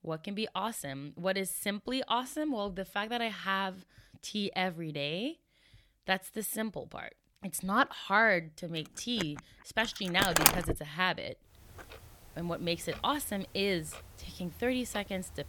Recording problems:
household noises; very loud; from 9 s on; 4 dB above the speech

